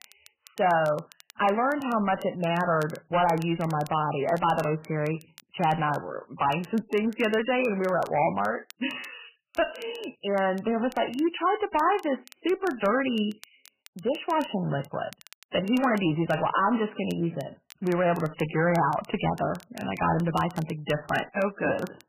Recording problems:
garbled, watery; badly; nothing above 3 kHz
distortion; slight; 5% of the sound clipped
crackle, like an old record; faint; 25 dB below the speech

